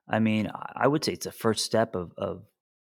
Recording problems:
none

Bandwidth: 17.5 kHz